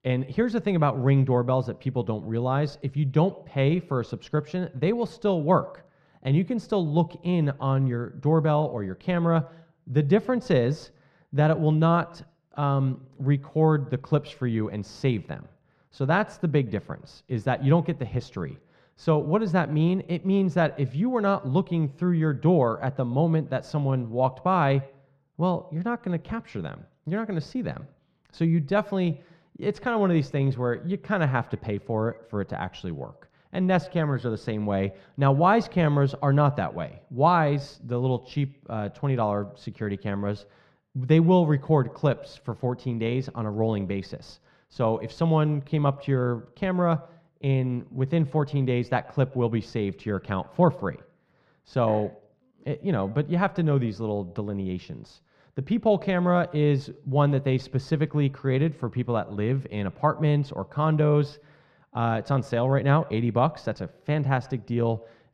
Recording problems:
muffled; very; fading above 3.5 kHz
echo of what is said; faint; throughout; 120 ms later, 25 dB below the speech

